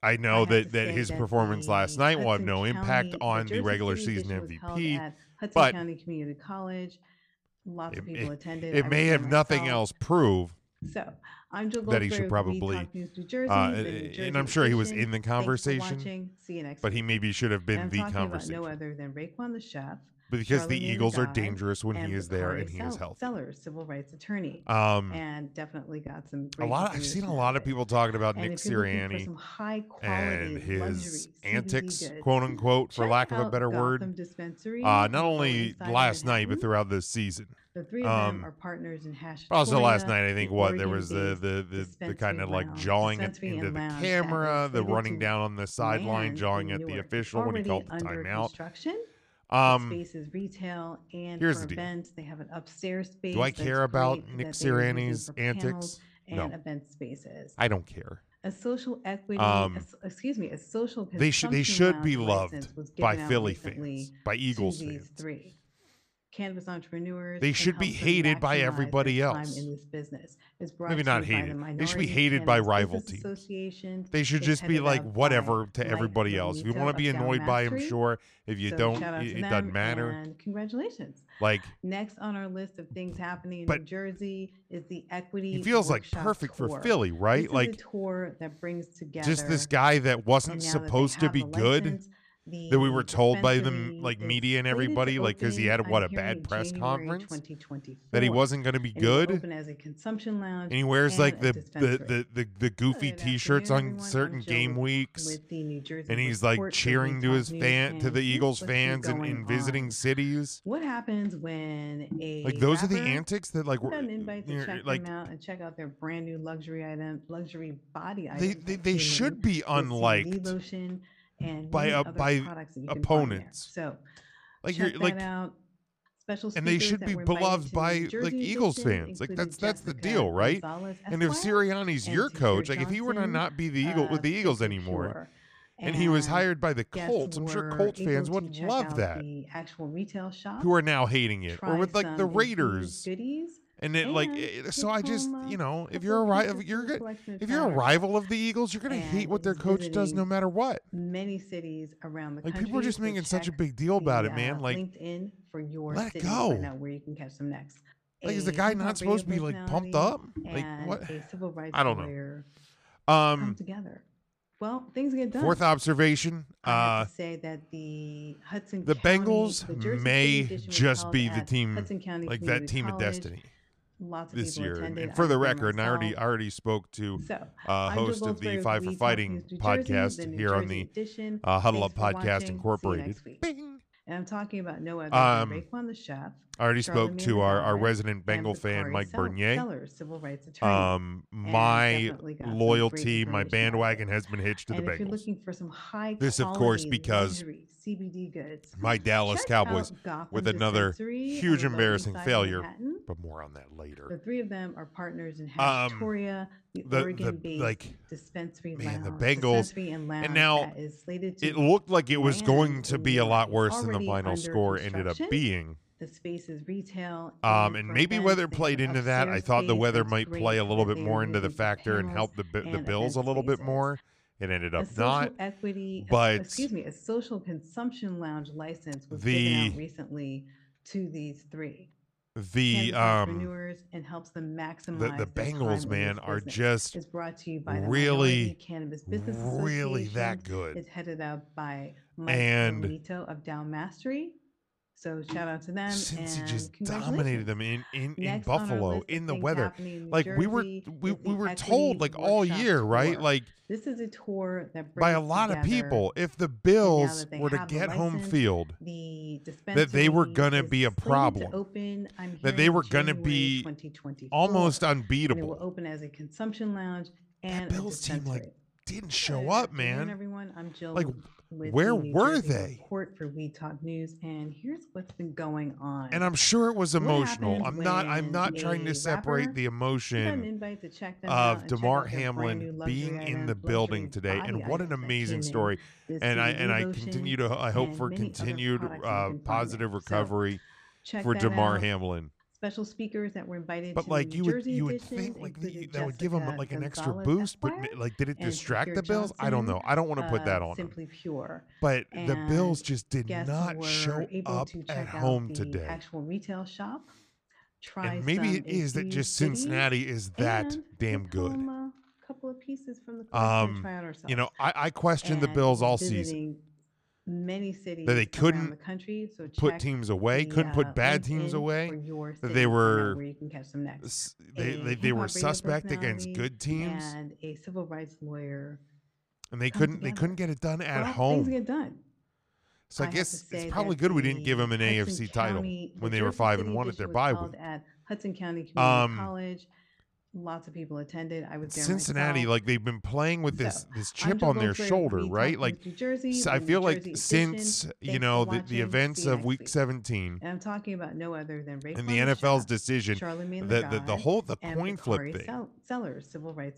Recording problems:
voice in the background; loud; throughout; 10 dB below the speech

